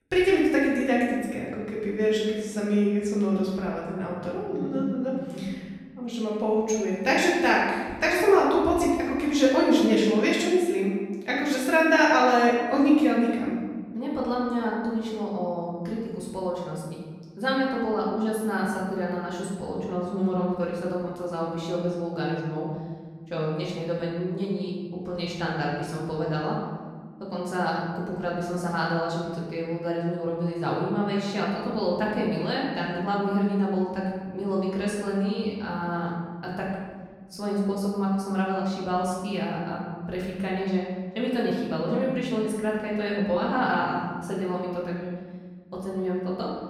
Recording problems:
off-mic speech; far
room echo; noticeable; dies away in 1.4 s

